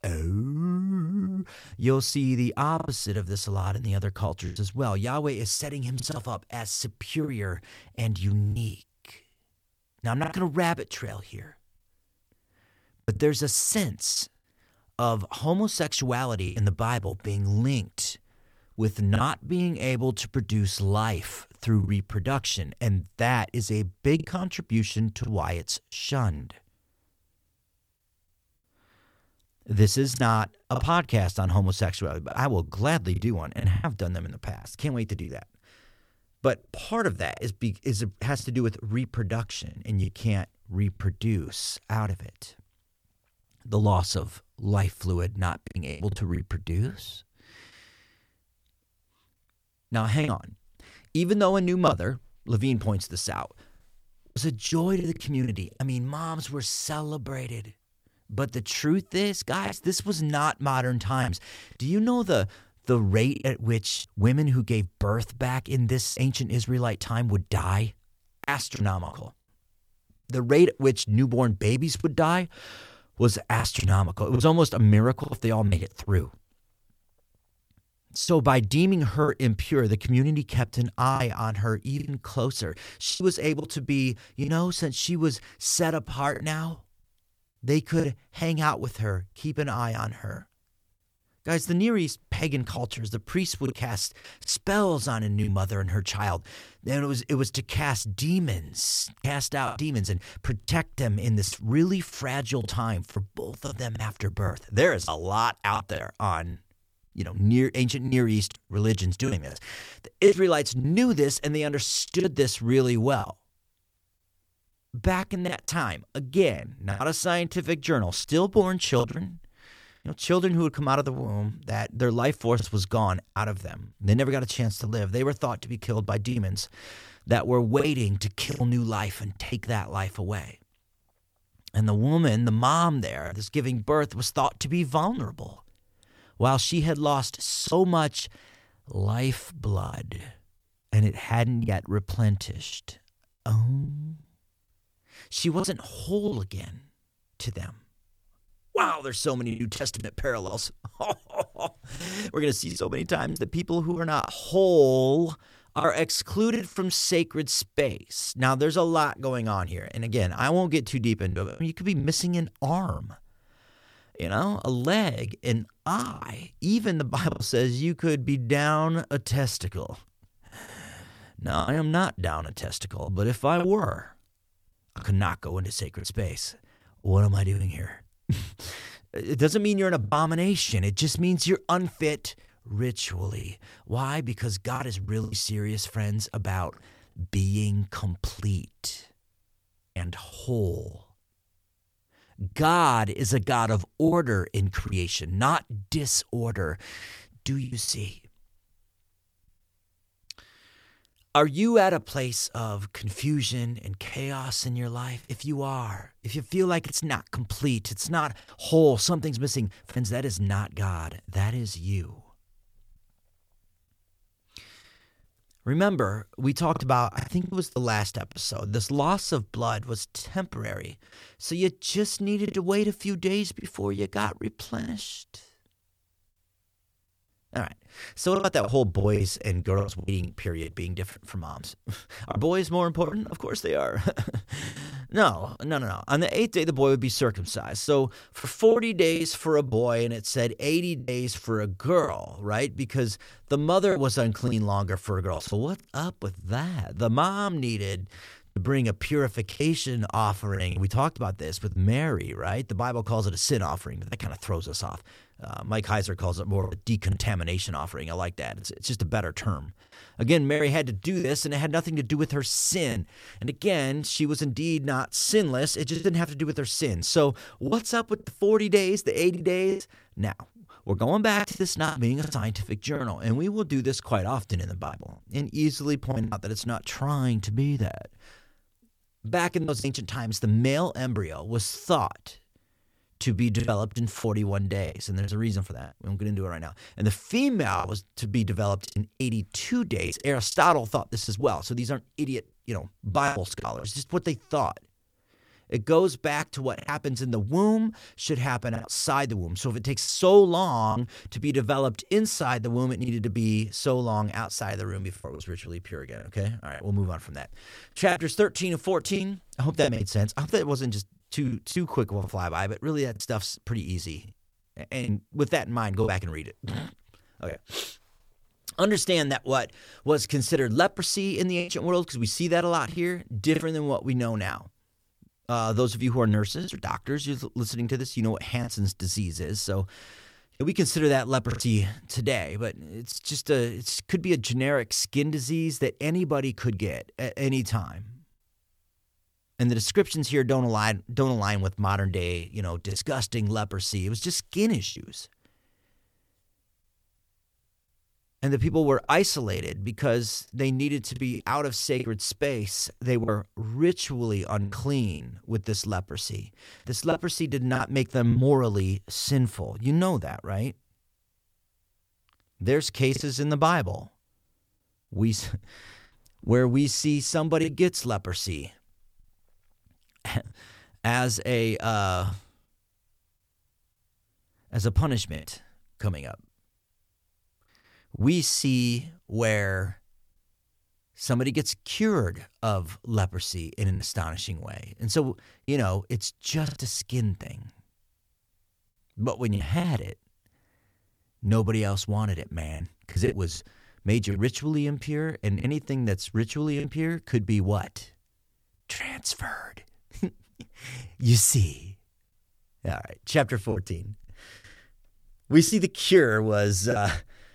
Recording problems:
choppy; occasionally; 5% of the speech affected

